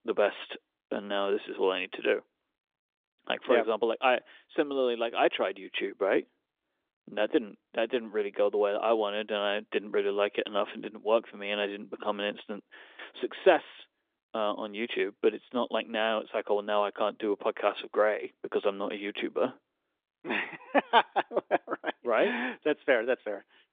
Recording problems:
phone-call audio; nothing above 3 kHz

